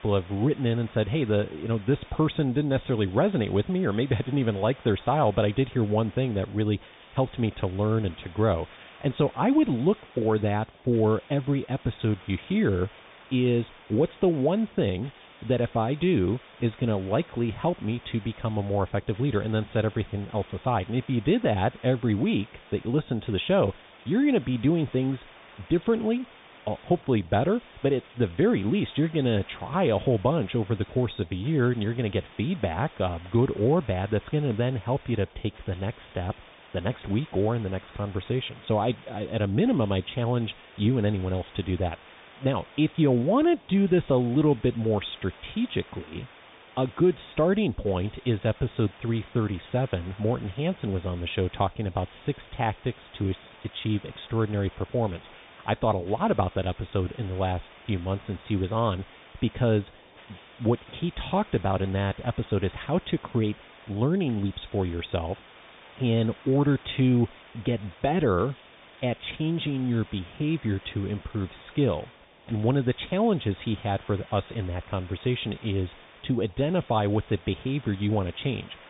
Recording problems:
high frequencies cut off; severe; nothing above 3.5 kHz
hiss; faint; throughout; 20 dB below the speech

